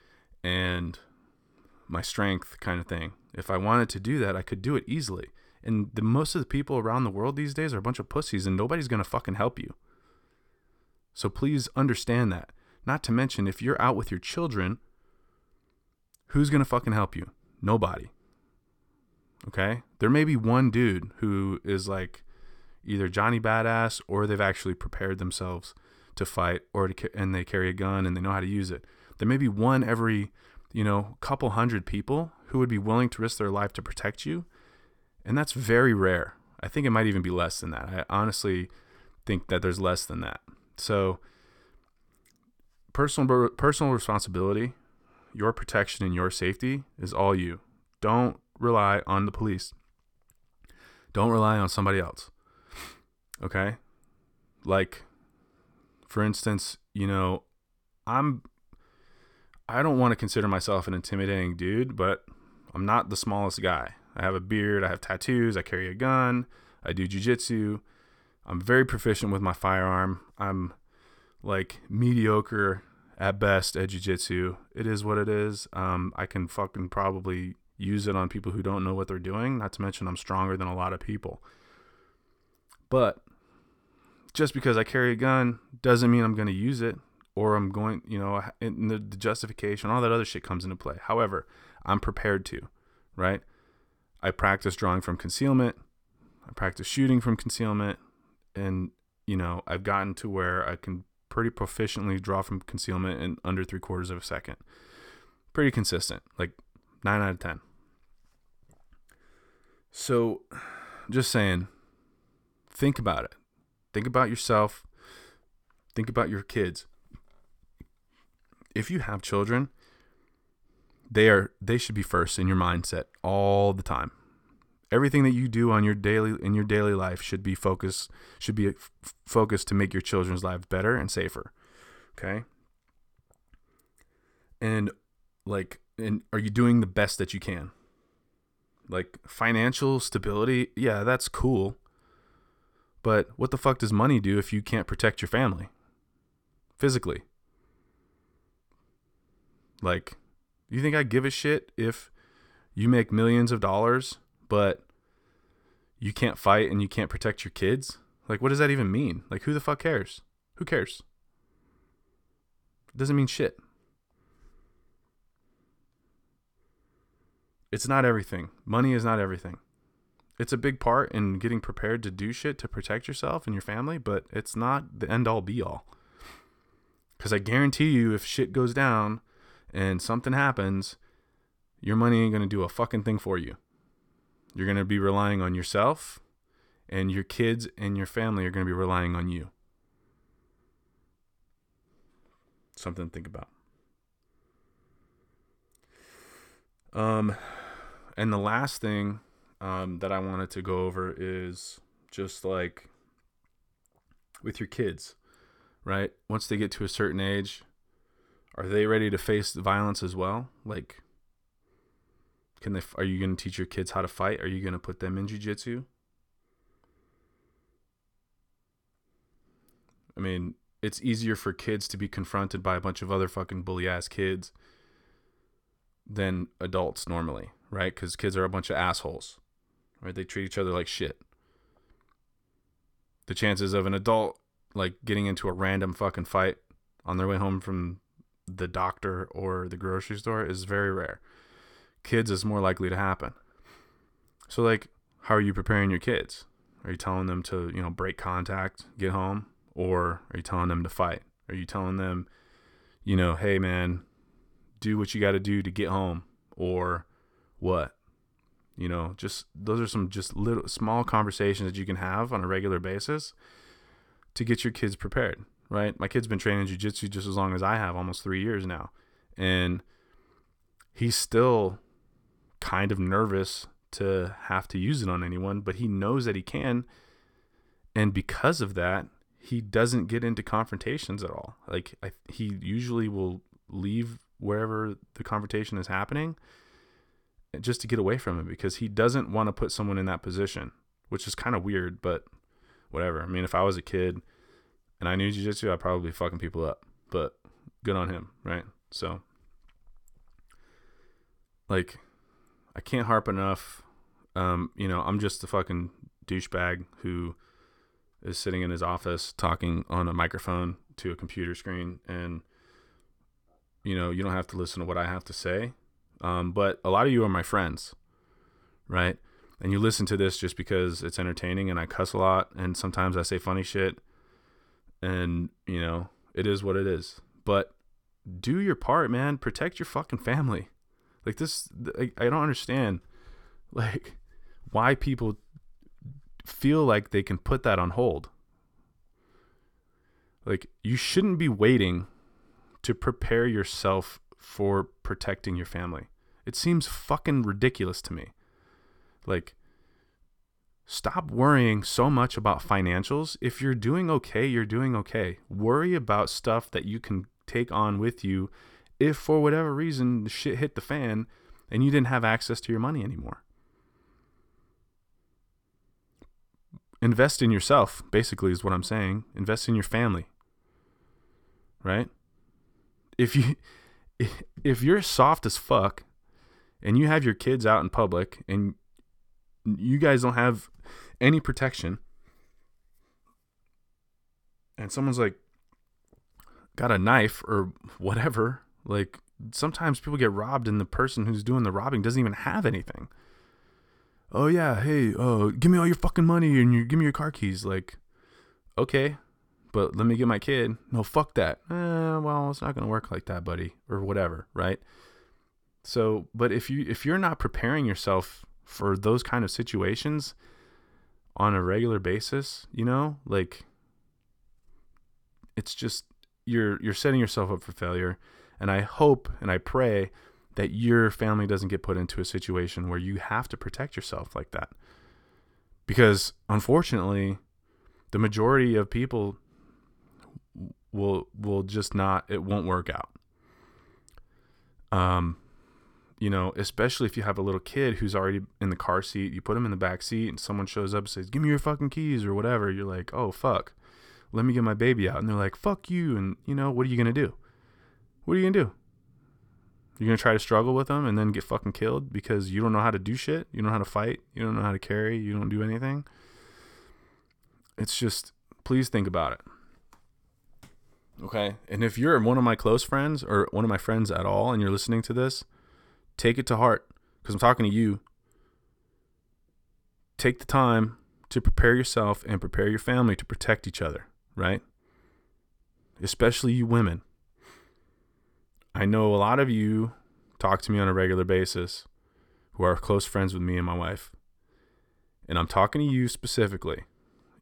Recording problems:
none

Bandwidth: 18.5 kHz